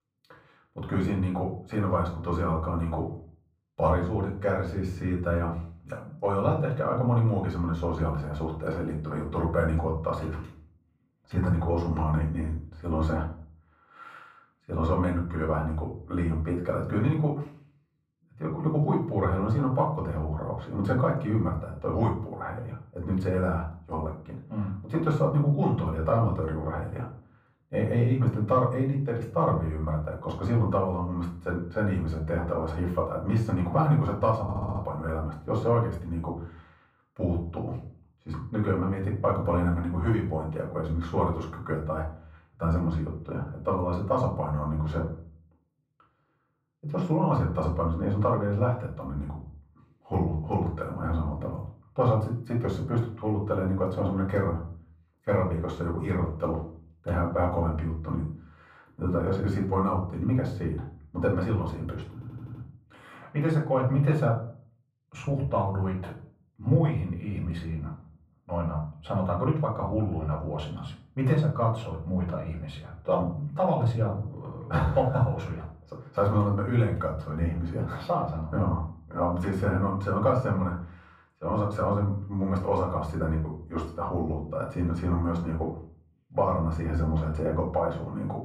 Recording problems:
off-mic speech; far
muffled; very; fading above 1.5 kHz
room echo; slight; dies away in 0.4 s
audio stuttering; at 34 s and at 1:02

